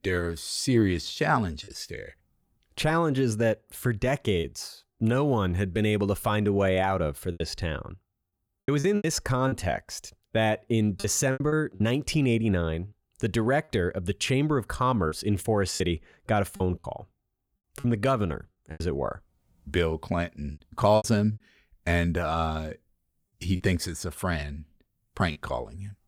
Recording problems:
choppy; very; 6% of the speech affected

